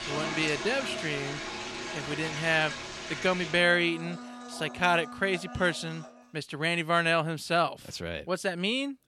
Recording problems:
household noises; loud; until 6 s; 9 dB below the speech

